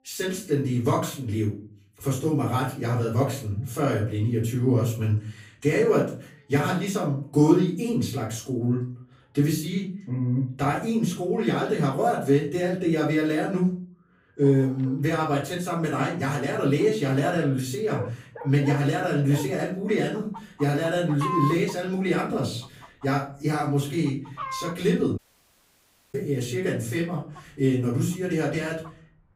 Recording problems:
off-mic speech; far
room echo; slight; dies away in 0.4 s
animal sounds; noticeable; throughout; 15 dB below the speech
audio cutting out; at 25 s for 1 s

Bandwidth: 15.5 kHz